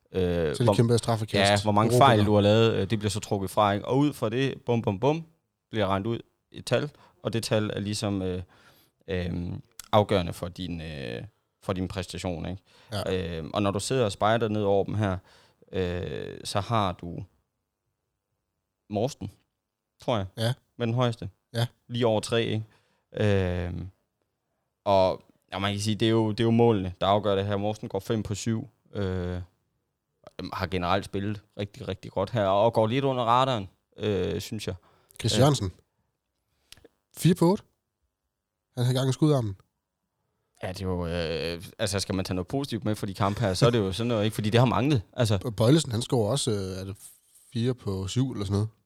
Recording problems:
none

